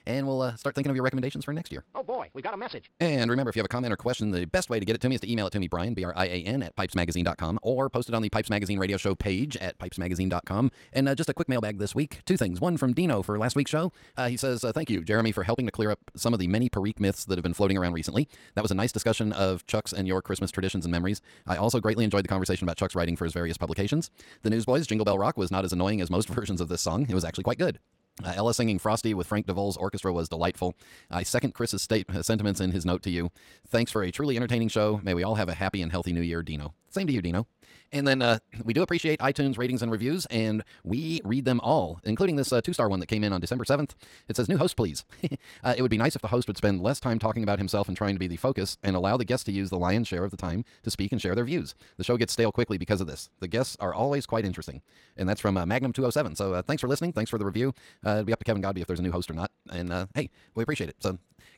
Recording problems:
wrong speed, natural pitch; too fast; 1.8 times normal speed

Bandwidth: 16.5 kHz